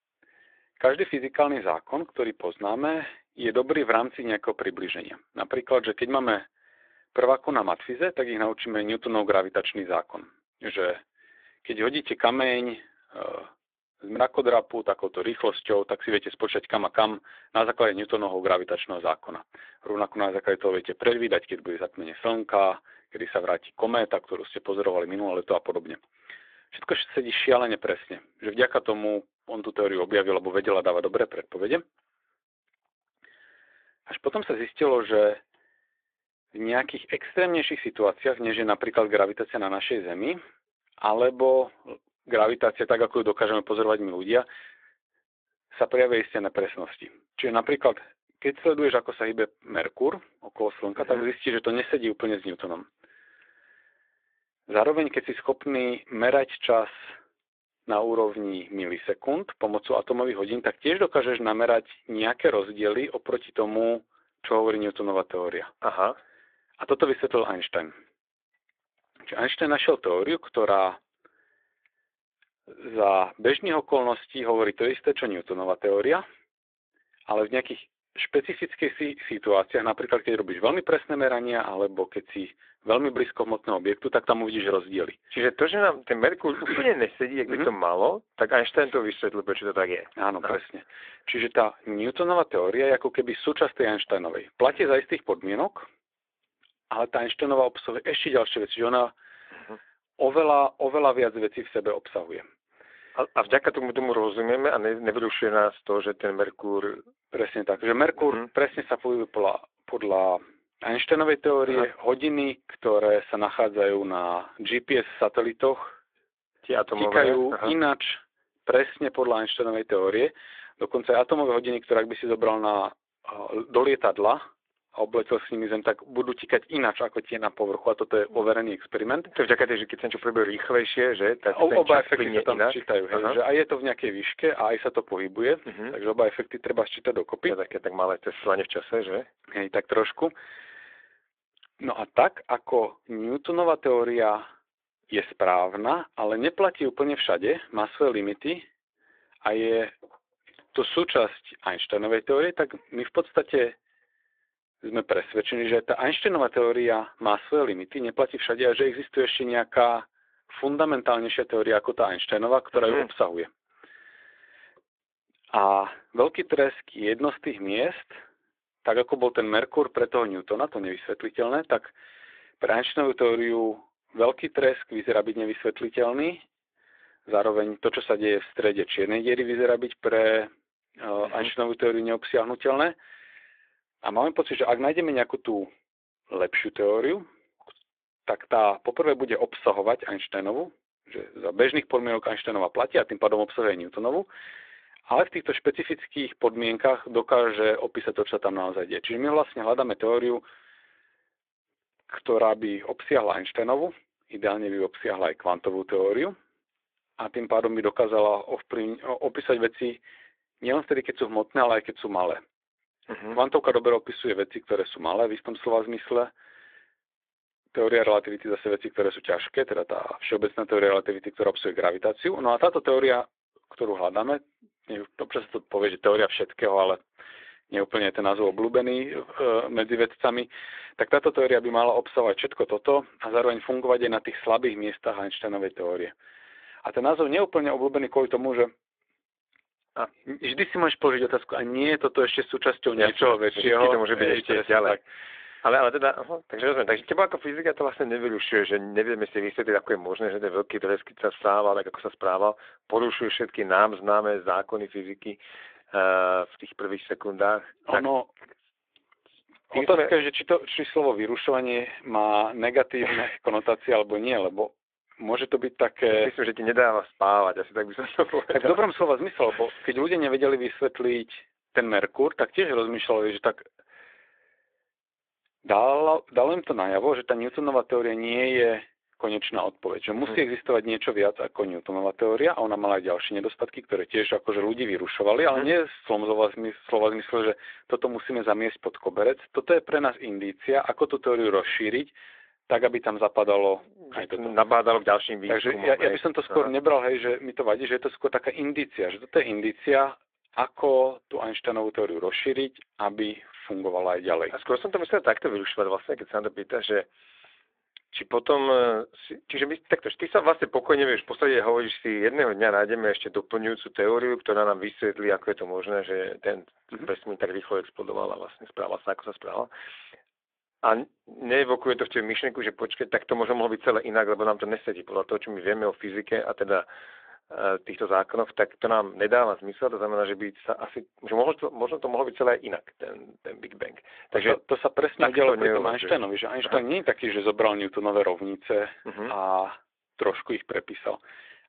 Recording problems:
phone-call audio

